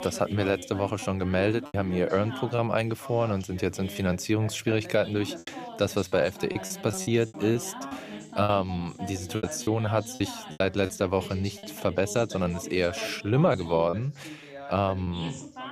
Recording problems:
background chatter; noticeable; throughout; 2 voices, 15 dB below the speech
choppy; very; 6% of the speech affected

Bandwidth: 14.5 kHz